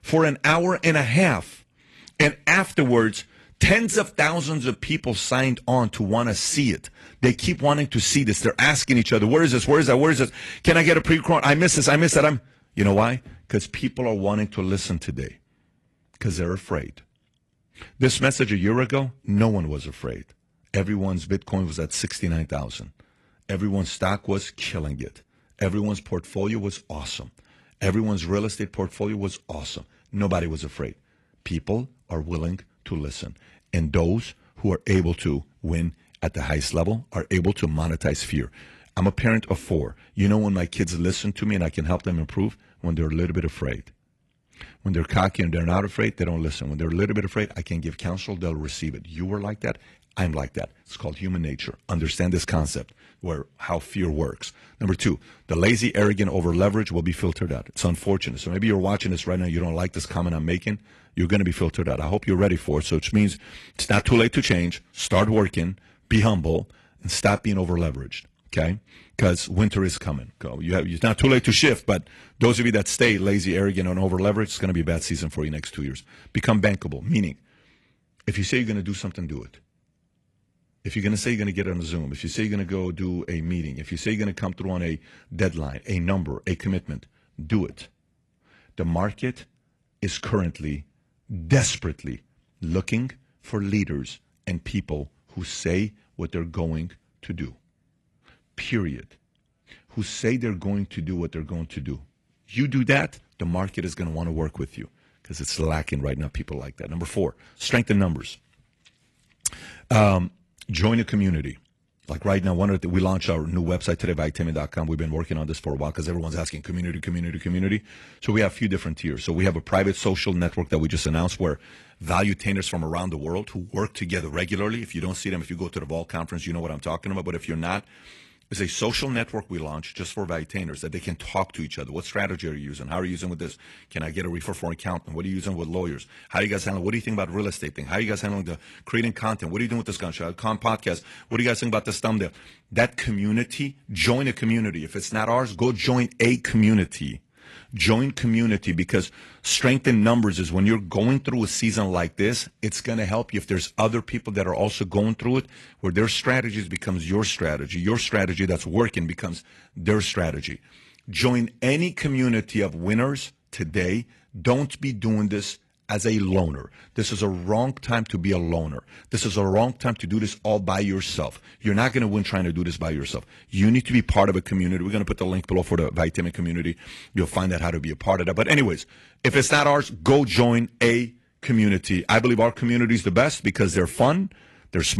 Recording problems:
garbled, watery; slightly; nothing above 11.5 kHz
abrupt cut into speech; at the end

